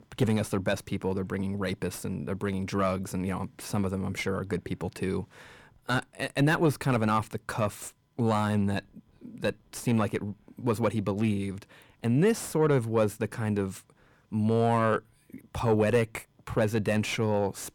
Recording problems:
distortion; slight; 10 dB below the speech

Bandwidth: 18.5 kHz